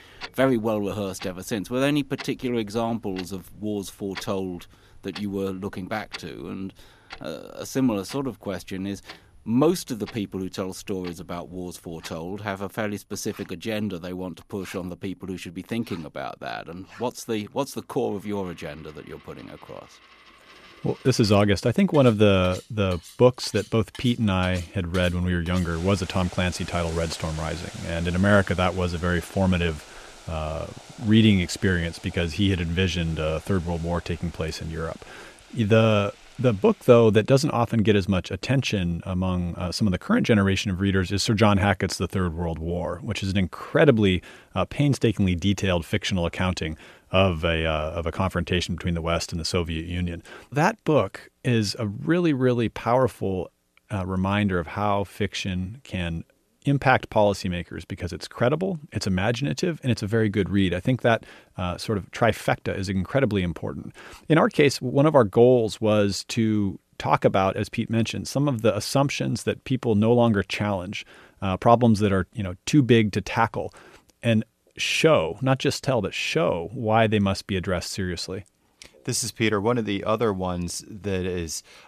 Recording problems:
household noises; noticeable; until 37 s; 20 dB below the speech

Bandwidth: 14.5 kHz